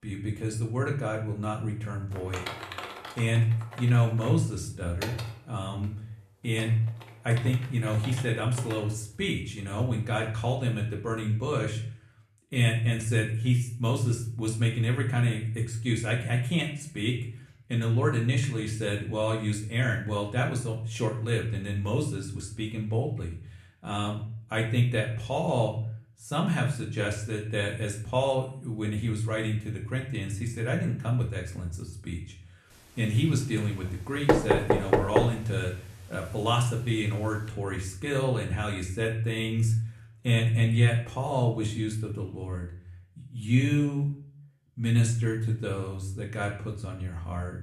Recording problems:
room echo; slight; dies away in 0.5 s
off-mic speech; somewhat distant
keyboard typing; noticeable; from 2 to 9 s; peak 7 dB below the speech
door banging; loud; at 34 s; peak 6 dB above the speech

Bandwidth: 13.5 kHz